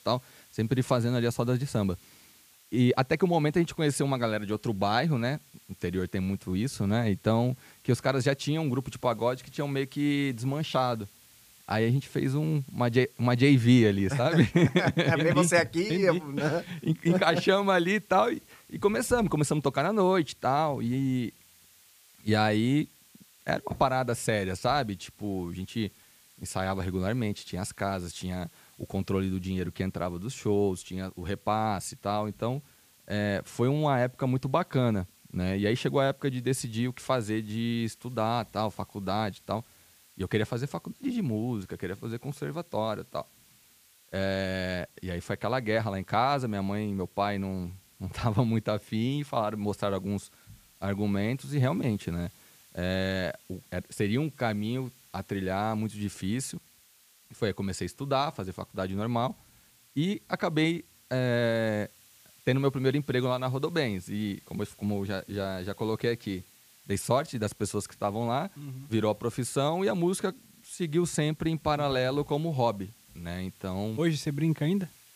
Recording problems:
hiss; faint; throughout; 25 dB below the speech

